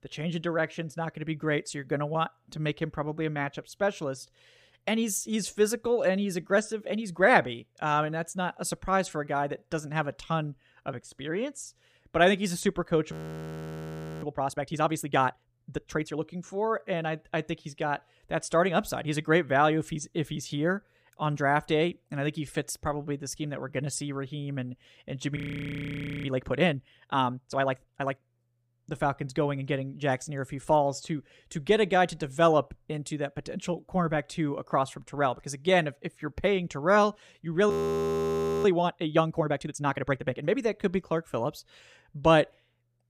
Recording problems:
audio freezing; at 13 s for 1 s, at 25 s for 1 s and at 38 s for 1 s

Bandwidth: 15 kHz